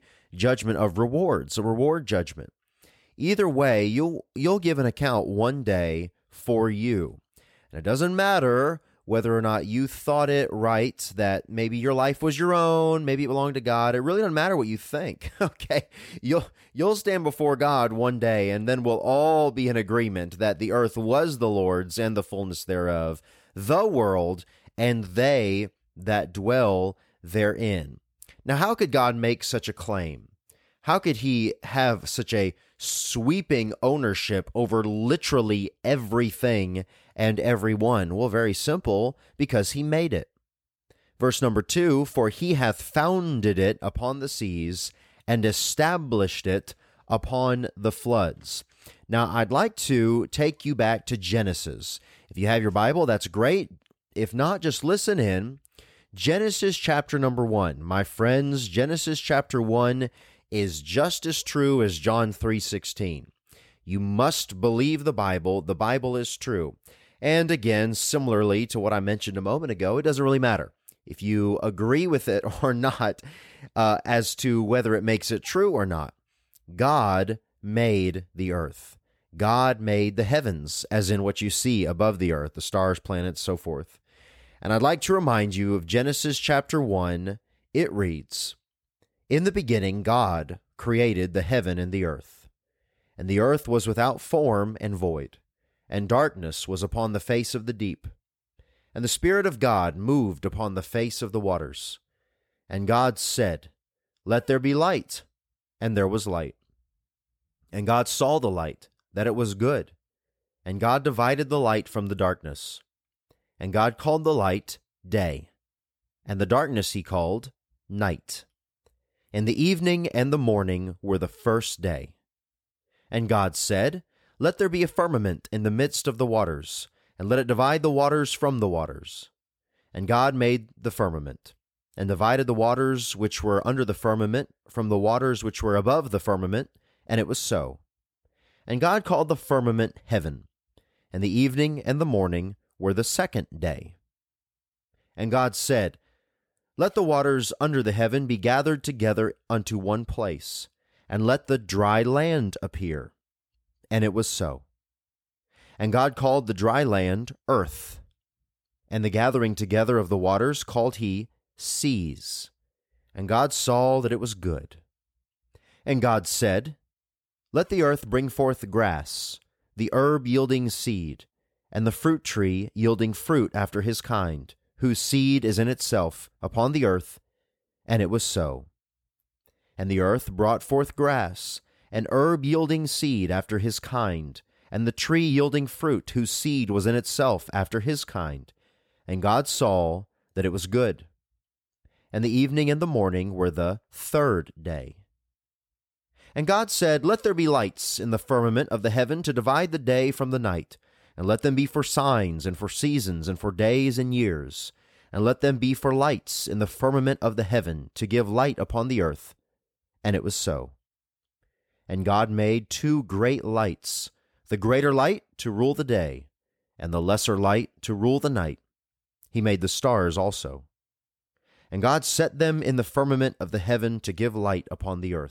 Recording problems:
none

